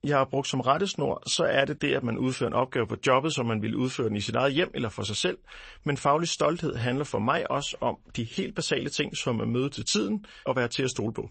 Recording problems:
garbled, watery; slightly; nothing above 8 kHz

